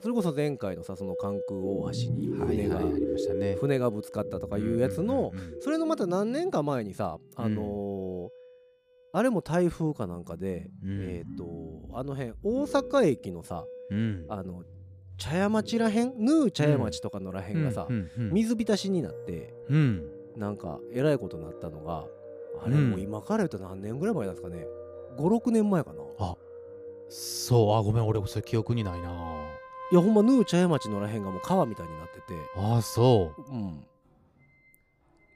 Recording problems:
background music; noticeable; throughout; 10 dB below the speech

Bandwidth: 15 kHz